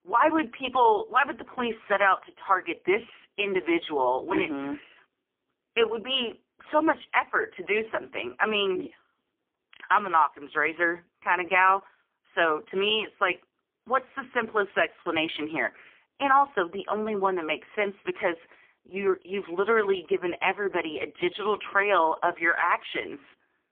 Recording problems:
phone-call audio; poor line; nothing above 3.5 kHz

